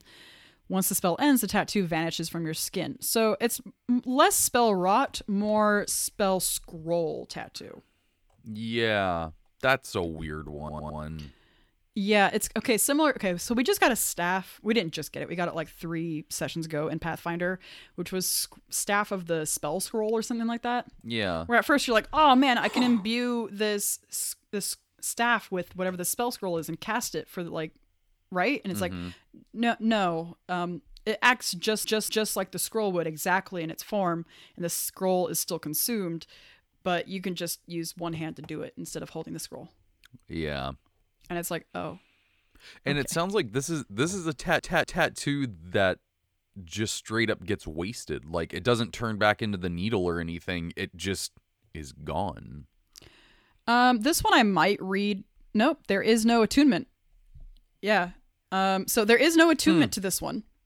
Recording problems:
audio stuttering; at 11 s, at 32 s and at 44 s

